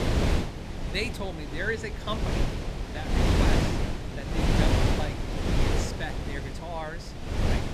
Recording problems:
wind noise on the microphone; heavy; 2 dB above the speech

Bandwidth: 14.5 kHz